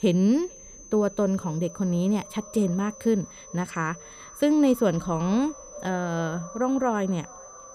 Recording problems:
echo of what is said; faint; throughout; 440 ms later, 20 dB below the speech
high-pitched whine; noticeable; throughout; 6 kHz, 20 dB below the speech

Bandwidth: 15 kHz